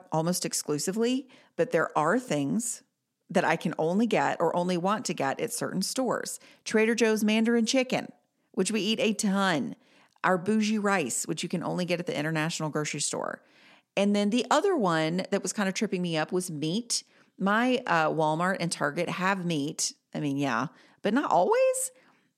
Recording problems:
none

